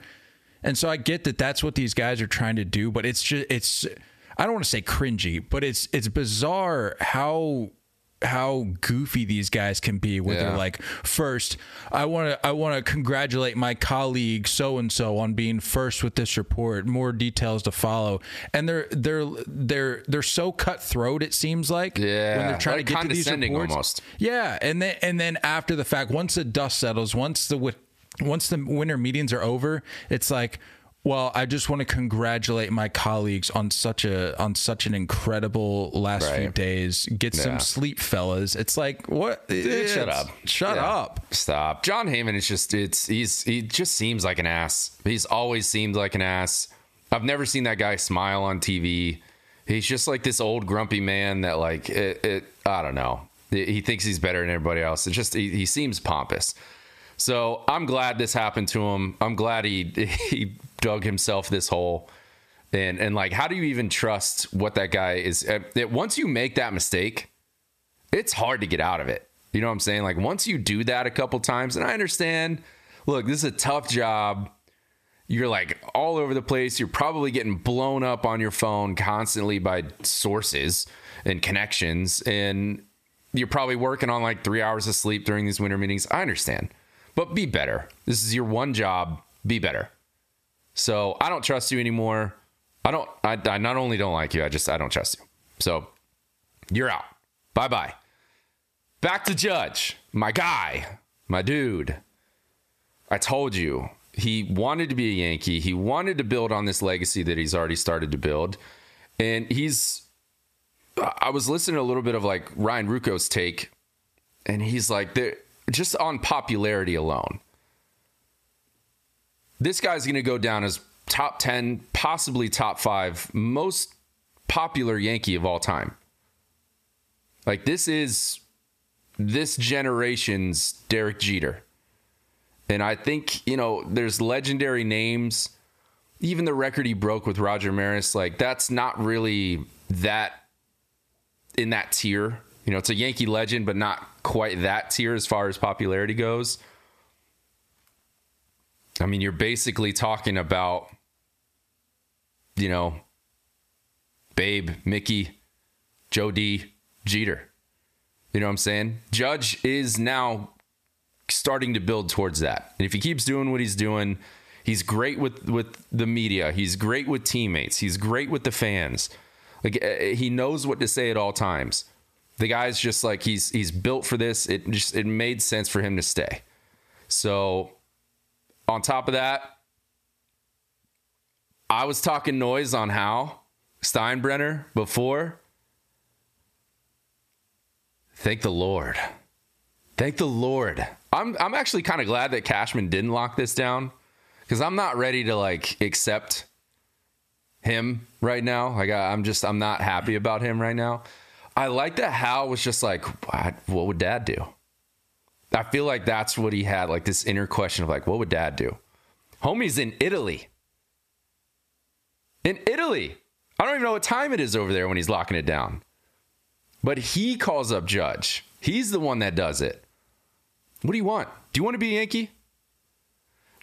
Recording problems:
squashed, flat; somewhat

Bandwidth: 14.5 kHz